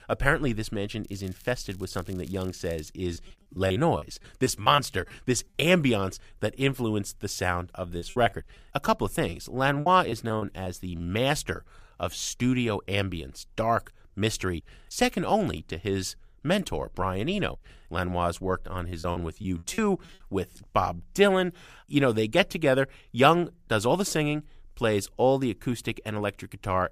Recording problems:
crackling; faint; from 1 to 3 s; 25 dB below the speech
choppy; very; from 3 to 5.5 s, from 8 to 11 s and from 19 to 20 s; 13% of the speech affected

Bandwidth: 15 kHz